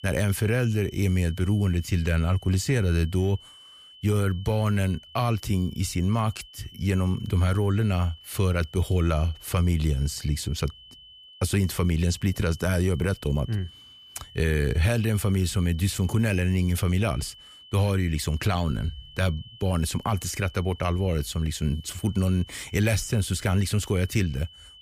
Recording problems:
high-pitched whine; faint; throughout; 3 kHz, 20 dB below the speech

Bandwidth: 15 kHz